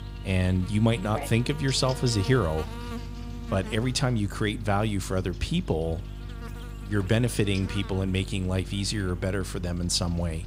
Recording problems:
electrical hum; noticeable; throughout; 50 Hz, 15 dB below the speech

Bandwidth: 15.5 kHz